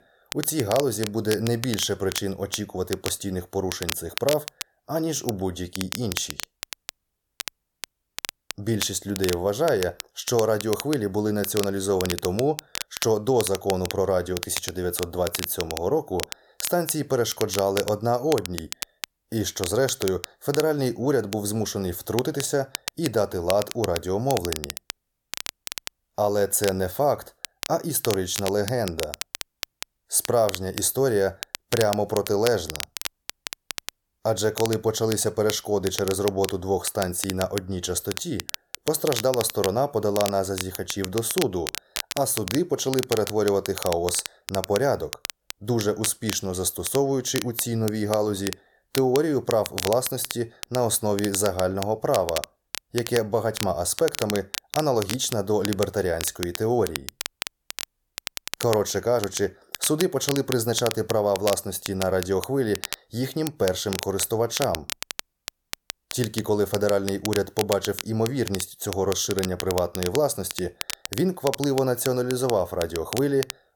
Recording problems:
crackle, like an old record; loud; 9 dB below the speech

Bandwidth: 18 kHz